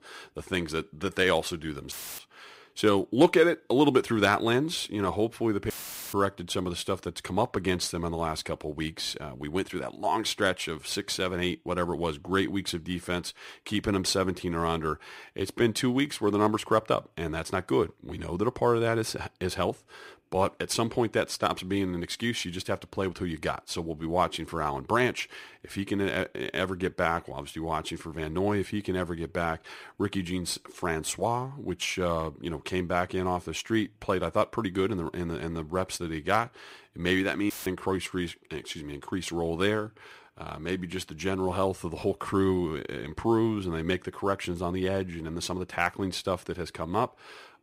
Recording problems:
audio cutting out; filled with static; at 2 s, at 5.5 s and at 38 s

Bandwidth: 15.5 kHz